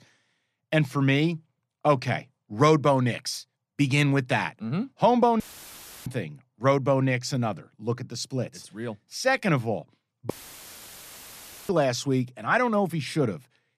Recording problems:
audio cutting out; filled with static; at 5.5 s for 0.5 s and at 10 s for 1.5 s

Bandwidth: 14.5 kHz